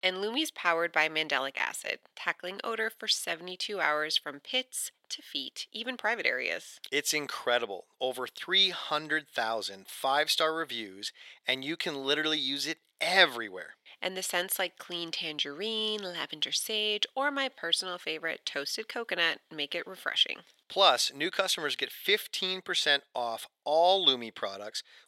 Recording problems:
thin; very; fading below 650 Hz

